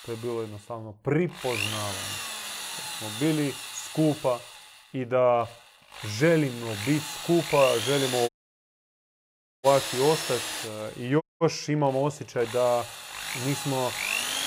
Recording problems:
machinery noise; loud; throughout; 5 dB below the speech
audio cutting out; at 8.5 s for 1.5 s and at 11 s

